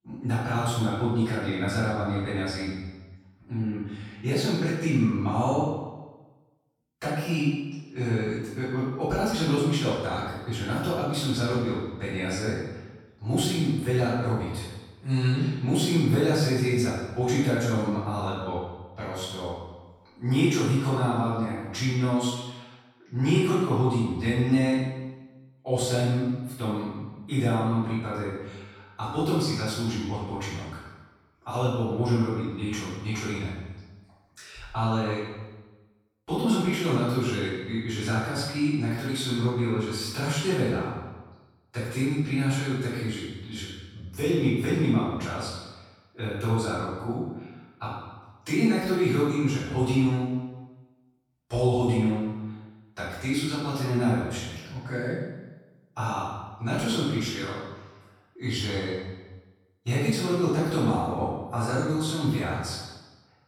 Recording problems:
room echo; strong; dies away in 1 s
off-mic speech; far

